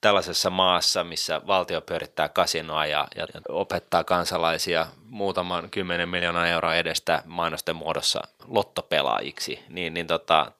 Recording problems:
thin; somewhat; fading below 900 Hz

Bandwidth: 15 kHz